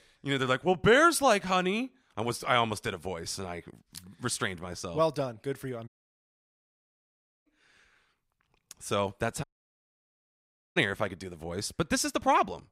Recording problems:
audio cutting out; at 6 s for 1.5 s and at 9.5 s for 1.5 s

